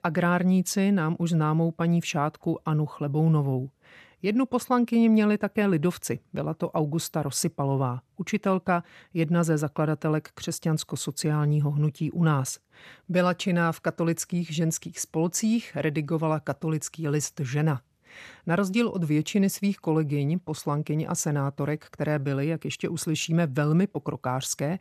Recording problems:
none

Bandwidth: 13.5 kHz